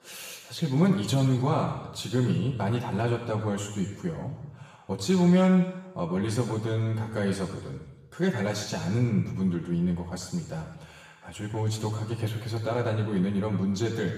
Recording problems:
off-mic speech; far
room echo; noticeable; dies away in 1.1 s

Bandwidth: 14.5 kHz